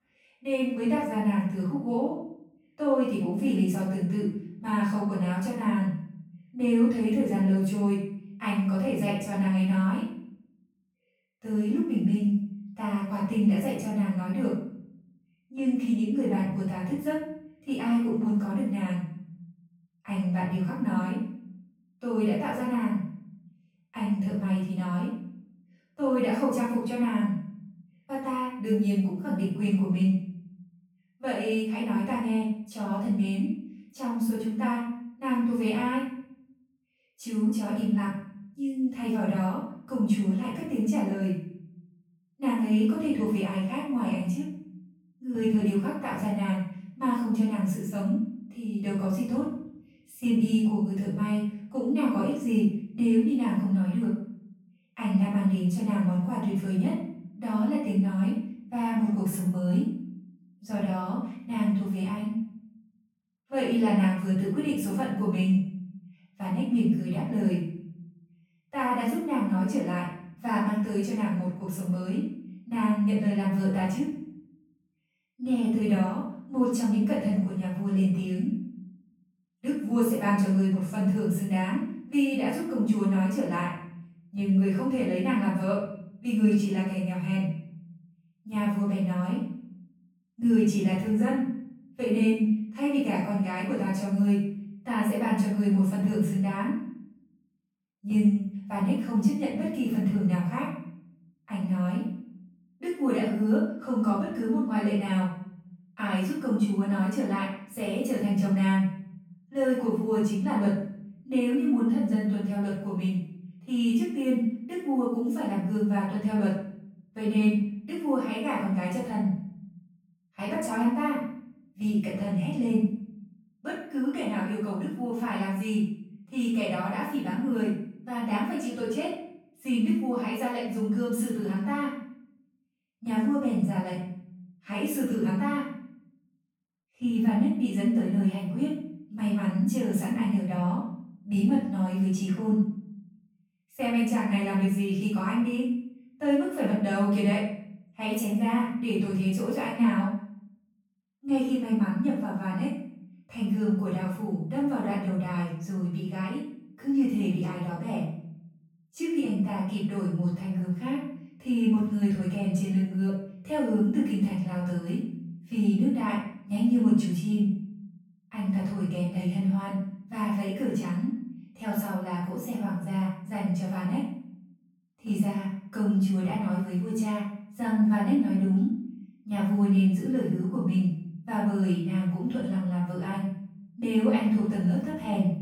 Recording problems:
off-mic speech; far
room echo; noticeable; dies away in 0.8 s

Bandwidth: 17 kHz